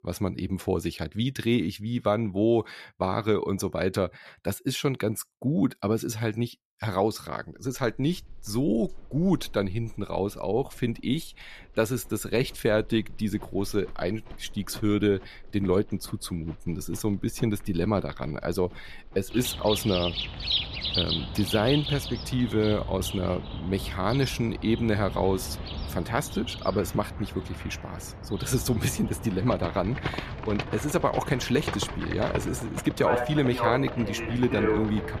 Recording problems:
animal sounds; loud; from 8 s on; 5 dB below the speech

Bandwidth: 14.5 kHz